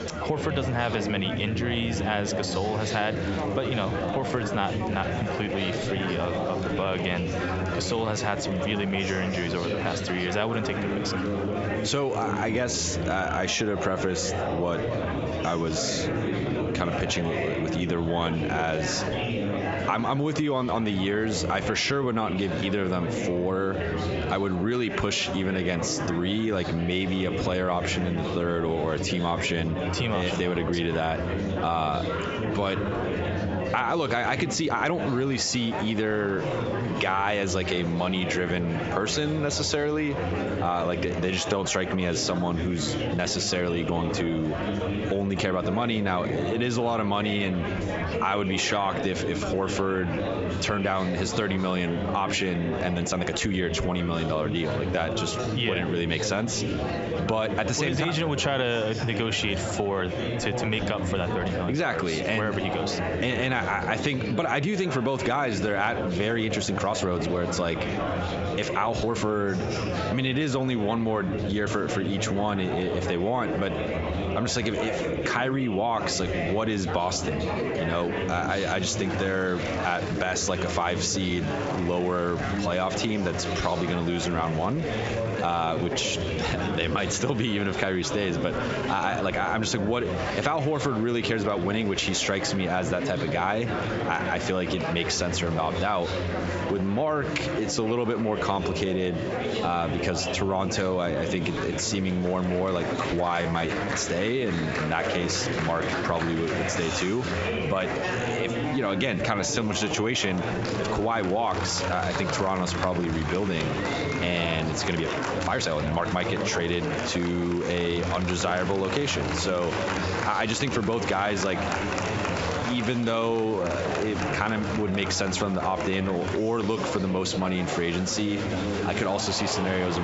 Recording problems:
squashed, flat; heavily, background pumping
high frequencies cut off; noticeable; nothing above 8 kHz
murmuring crowd; loud; throughout; 4 dB below the speech
uneven, jittery; strongly; from 4 s to 2:04
abrupt cut into speech; at the end

